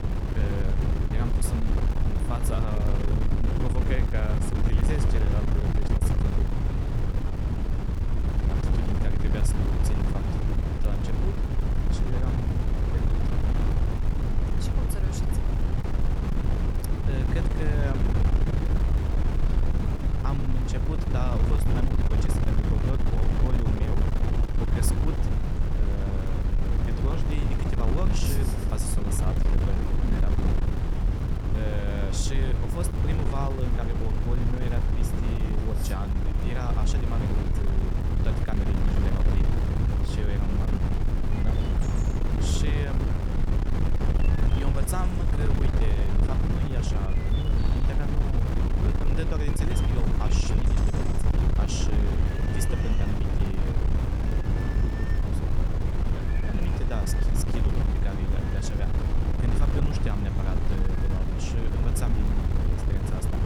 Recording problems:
wind noise on the microphone; heavy; 3 dB above the speech
animal sounds; noticeable; throughout; 15 dB below the speech
crackle, like an old record; faint; 25 dB below the speech

